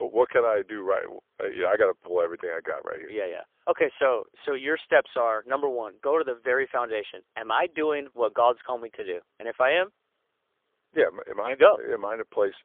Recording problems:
phone-call audio; poor line; nothing above 3.5 kHz
abrupt cut into speech; at the start

